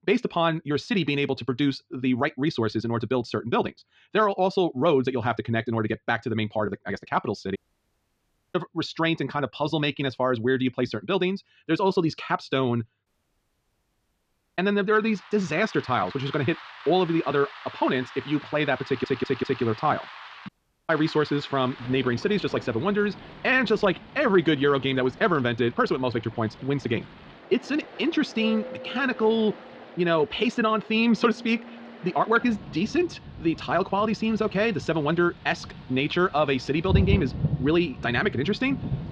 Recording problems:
wrong speed, natural pitch; too fast; 1.5 times normal speed
muffled; slightly; fading above 4 kHz
rain or running water; noticeable; from 15 s on; 10 dB below the speech
audio cutting out; at 7.5 s for 1 s, at 13 s for 1.5 s and at 20 s
audio stuttering; at 19 s

